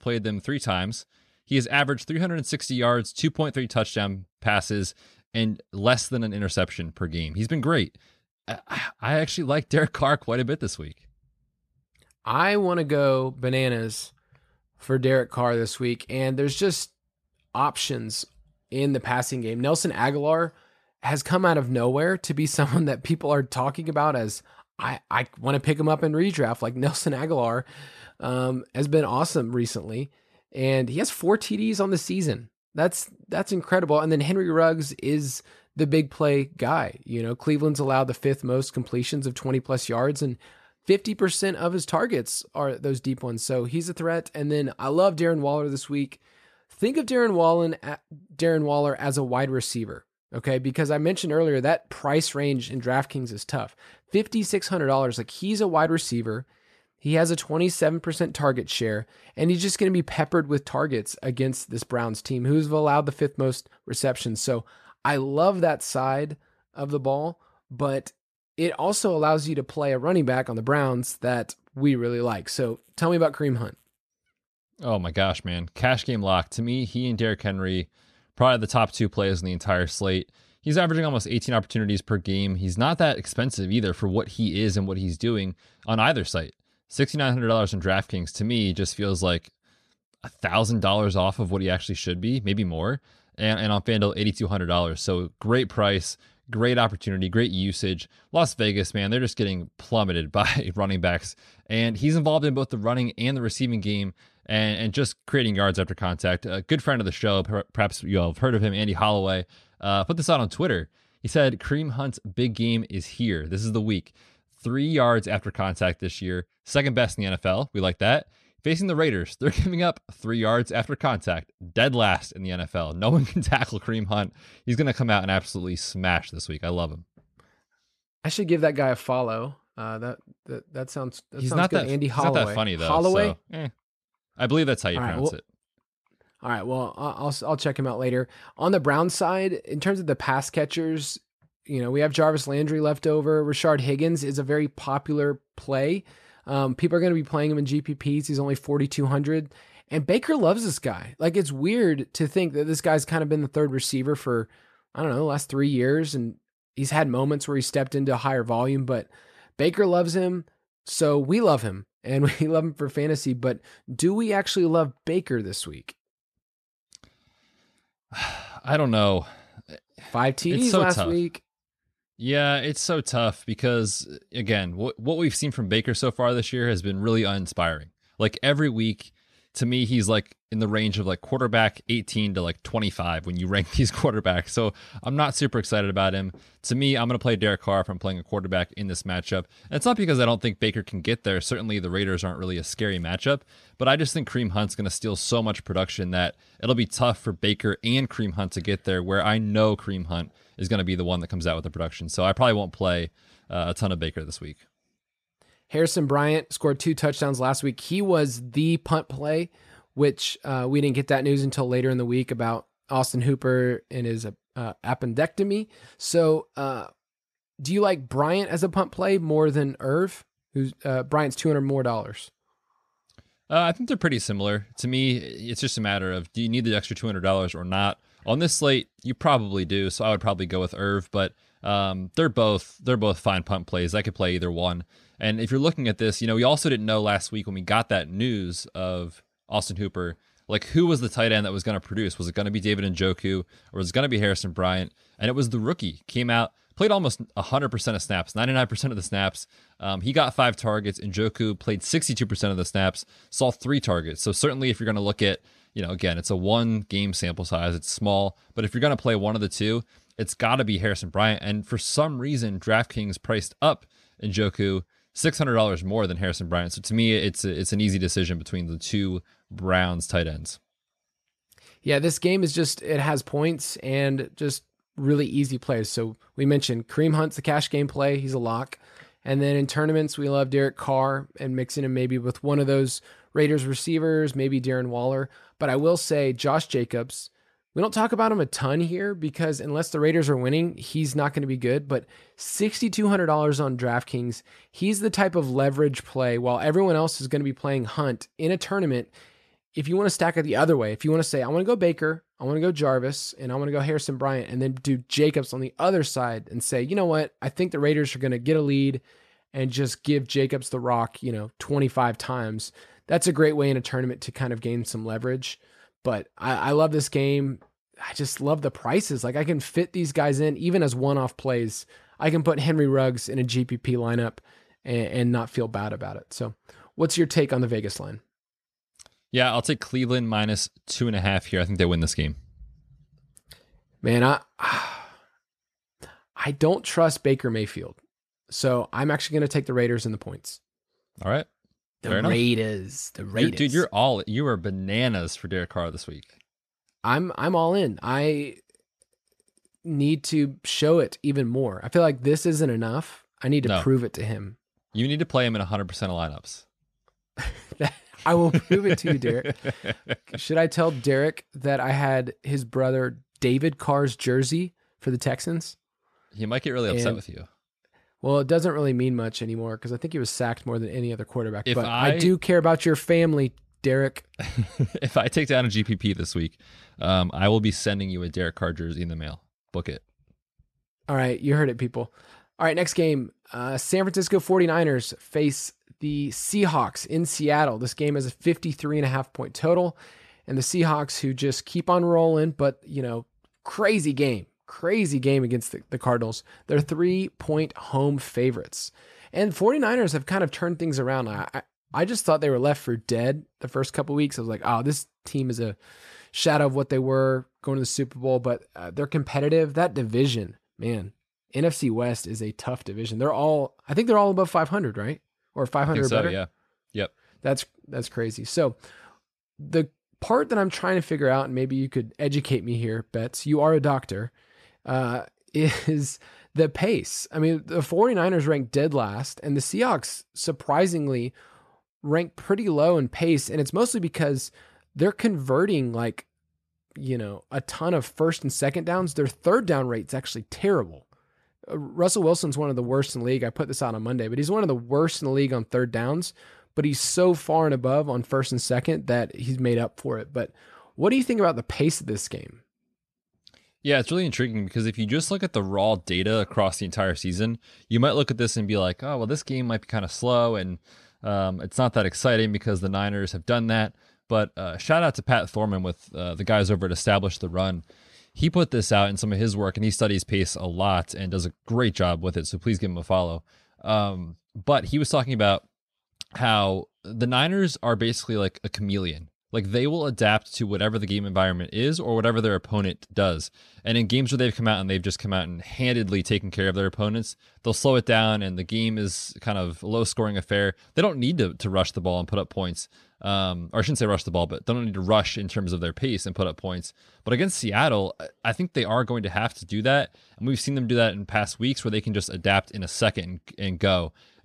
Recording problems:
none

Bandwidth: 13.5 kHz